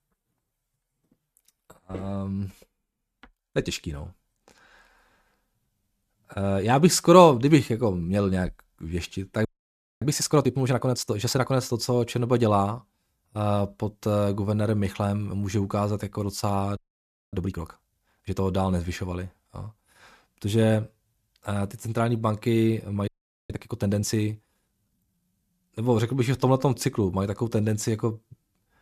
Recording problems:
audio freezing; at 9.5 s for 0.5 s, at 17 s for 0.5 s and at 23 s

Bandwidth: 14.5 kHz